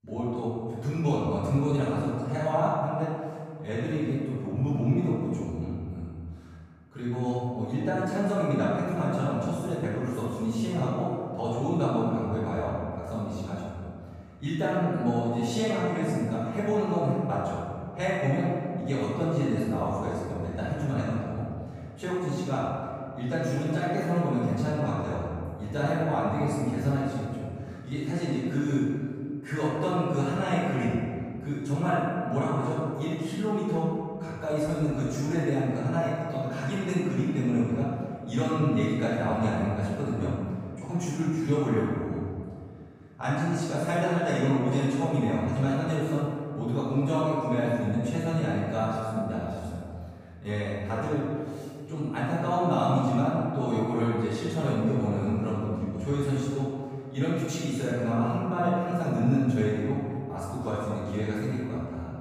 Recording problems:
room echo; strong; dies away in 1.9 s
off-mic speech; far

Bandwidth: 15.5 kHz